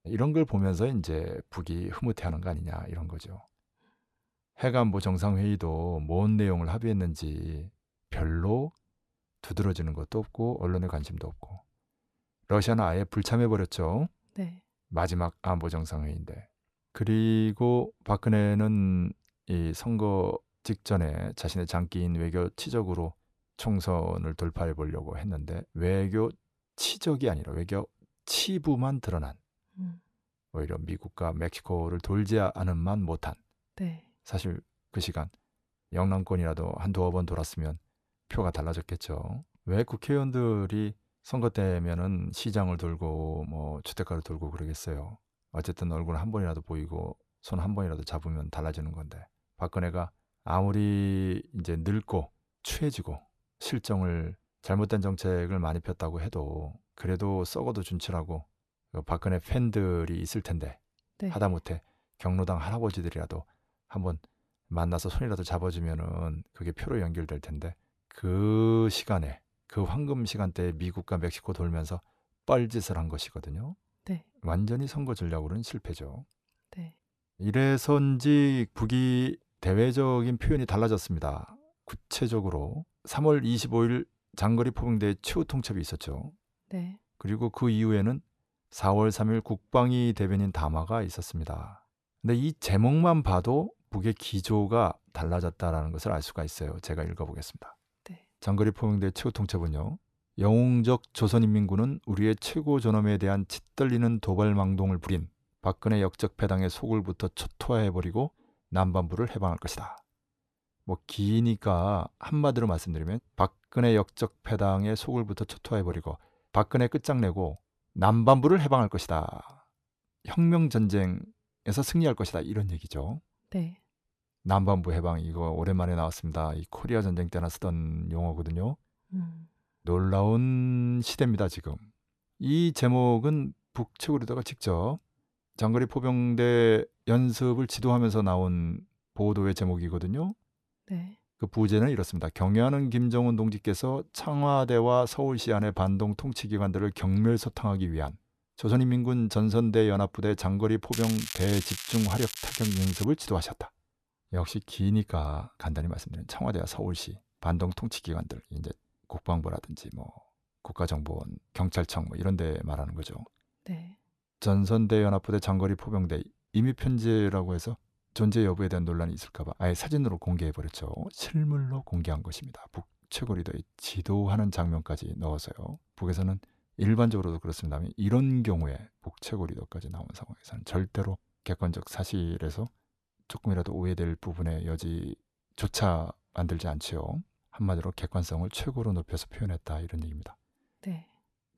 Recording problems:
crackling; loud; from 2:31 to 2:33; 7 dB below the speech

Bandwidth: 14 kHz